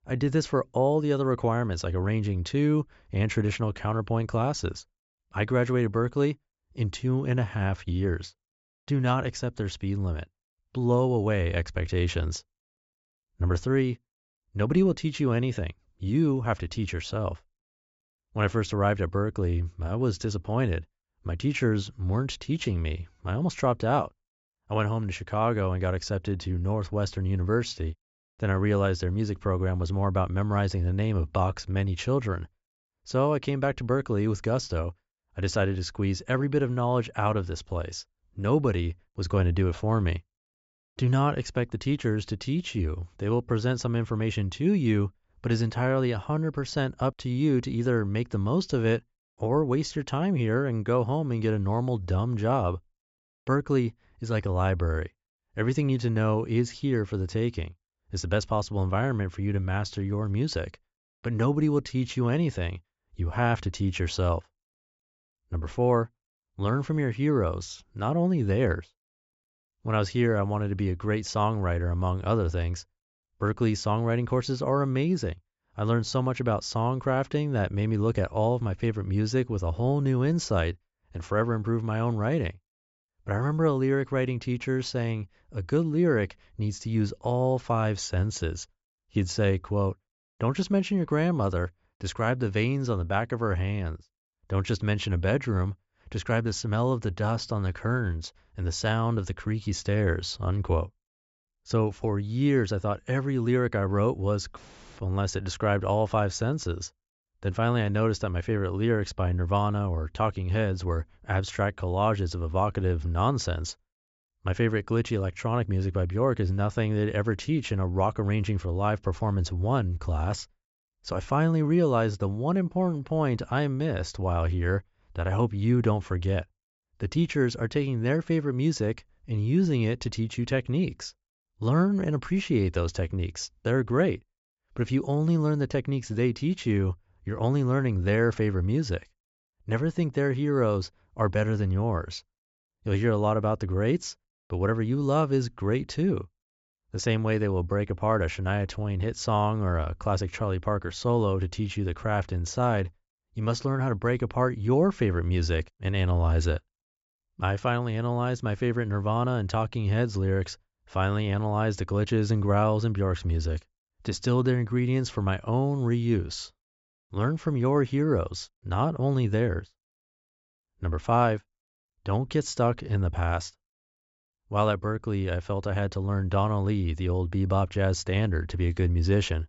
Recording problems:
high frequencies cut off; noticeable; nothing above 8 kHz

